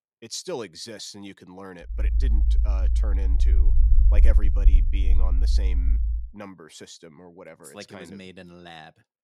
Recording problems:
low rumble; loud; from 2 to 6 s; 6 dB below the speech

